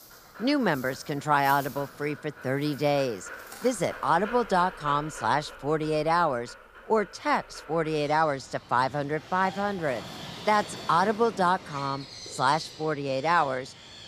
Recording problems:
animal sounds; noticeable; throughout; 15 dB below the speech

